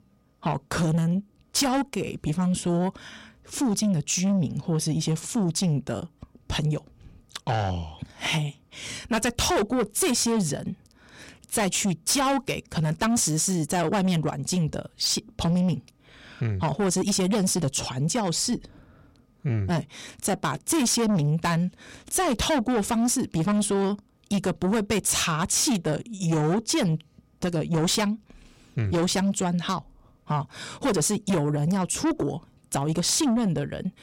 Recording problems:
distortion; heavy; 8 dB below the speech

